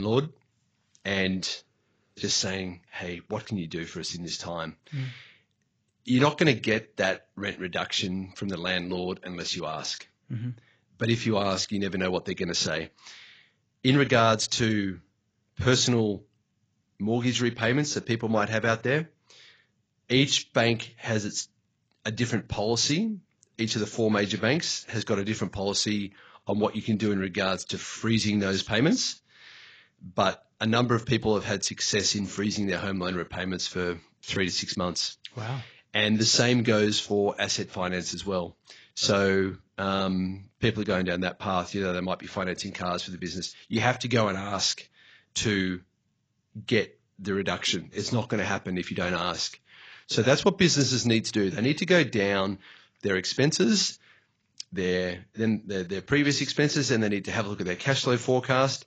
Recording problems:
garbled, watery; badly; nothing above 7.5 kHz
abrupt cut into speech; at the start

